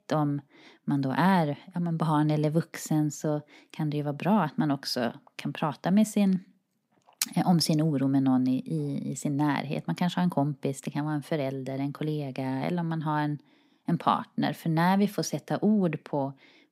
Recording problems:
none

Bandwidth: 15.5 kHz